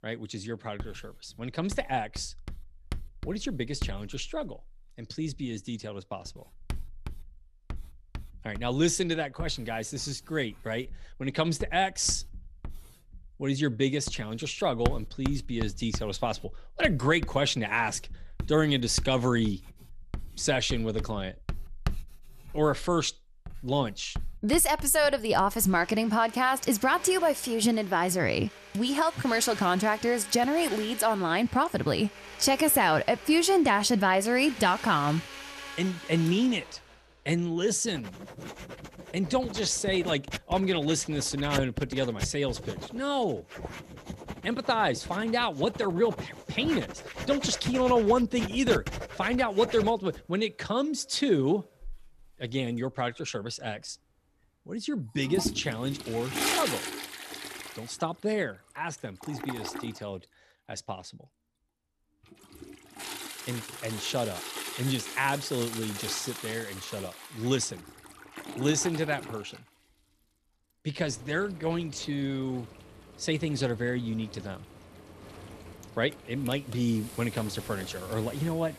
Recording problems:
household noises; noticeable; throughout; 10 dB below the speech

